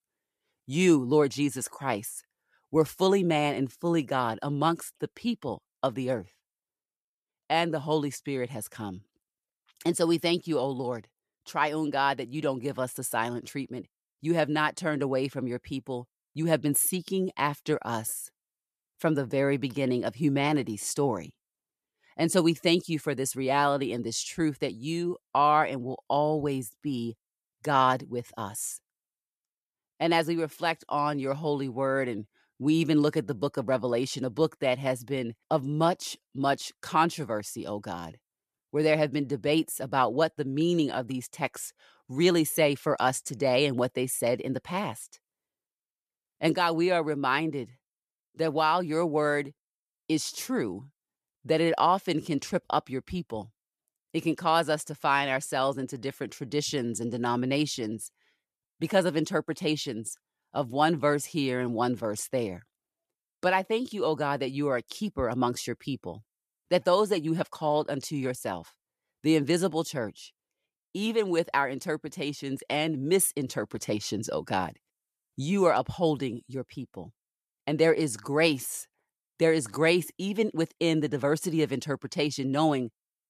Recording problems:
none

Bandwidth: 14.5 kHz